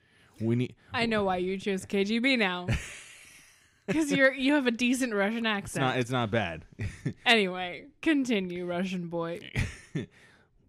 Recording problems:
none

